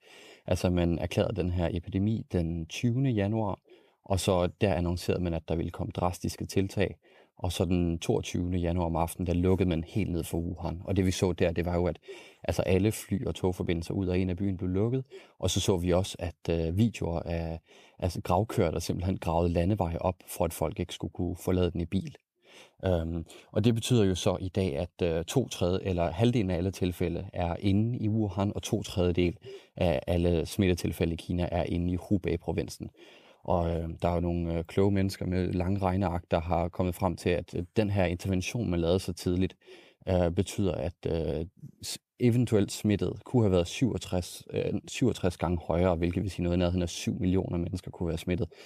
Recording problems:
none

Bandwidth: 14.5 kHz